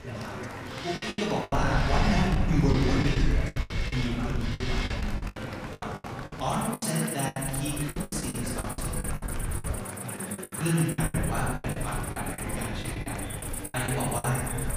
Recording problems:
off-mic speech; far
room echo; noticeable; dies away in 1.5 s
animal sounds; loud; throughout; 6 dB below the speech
murmuring crowd; loud; throughout; 9 dB below the speech
low rumble; noticeable; from 1.5 to 5.5 s, from 7.5 to 10 s and from 11 s on; 15 dB below the speech
choppy; very; 16% of the speech affected

